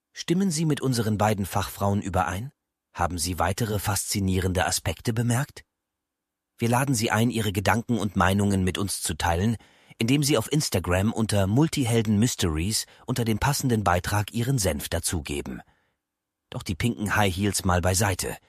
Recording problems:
none

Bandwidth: 14.5 kHz